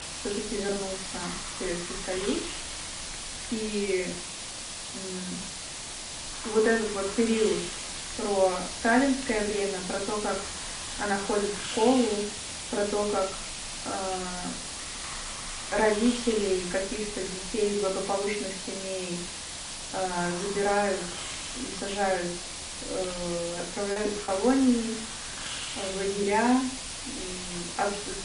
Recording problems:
off-mic speech; far
room echo; slight; dies away in 0.5 s
garbled, watery; slightly; nothing above 10.5 kHz
hiss; loud; throughout; 5 dB below the speech
choppy; very; at 24 s; 8% of the speech affected

